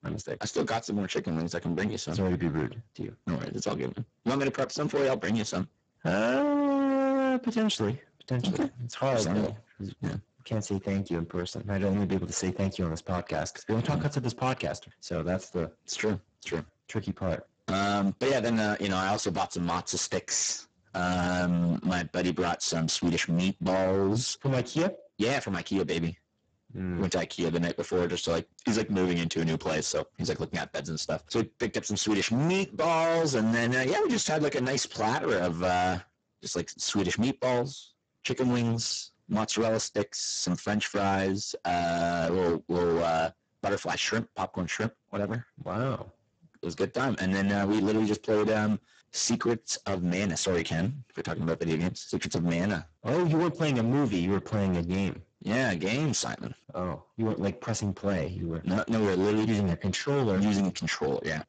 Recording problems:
distortion; heavy; 17% of the sound clipped
garbled, watery; badly; nothing above 7.5 kHz

